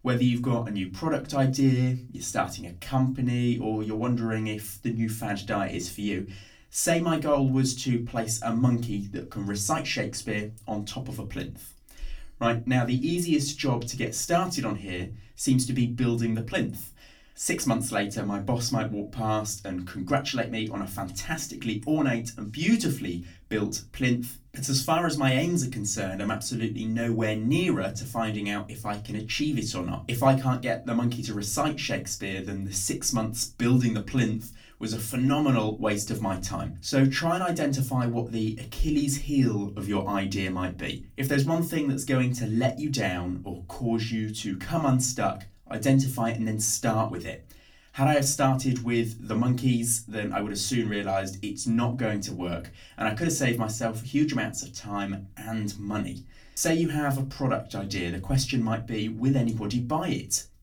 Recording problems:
off-mic speech; far
room echo; very slight; dies away in 0.2 s

